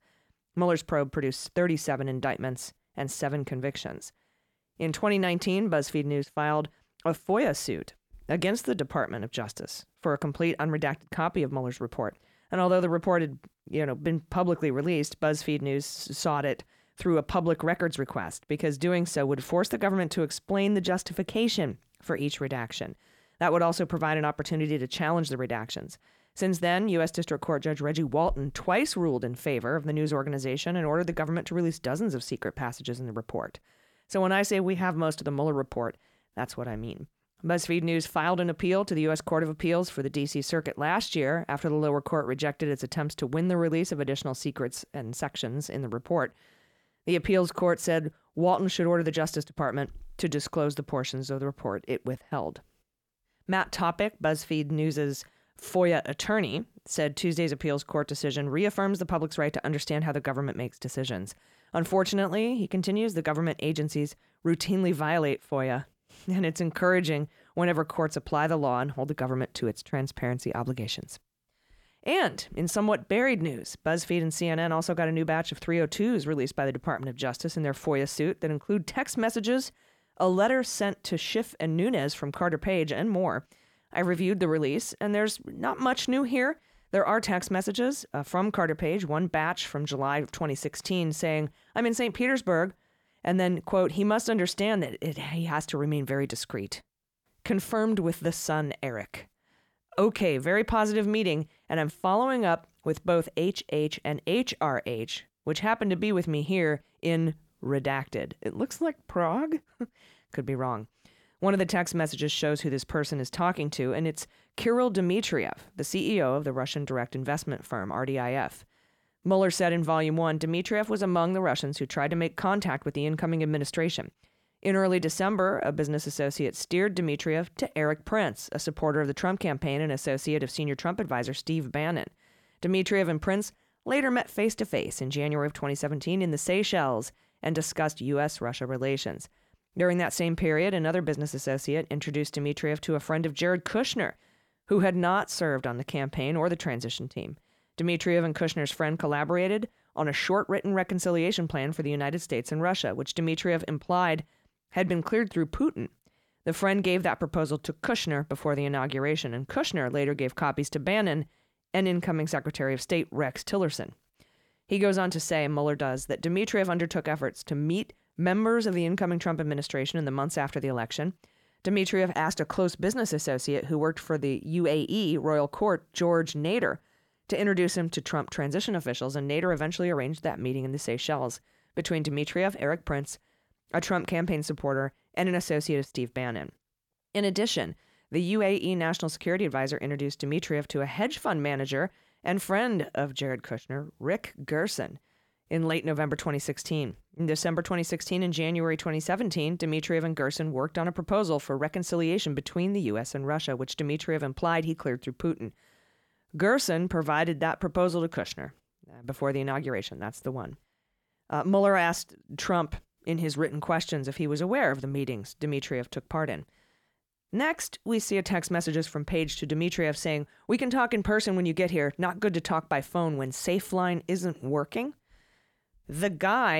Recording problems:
abrupt cut into speech; at the end

